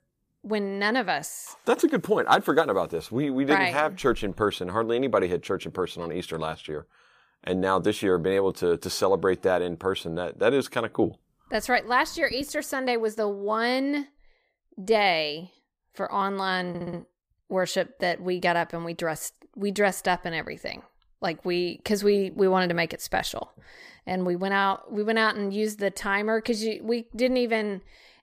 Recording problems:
audio stuttering; at 17 s

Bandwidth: 15 kHz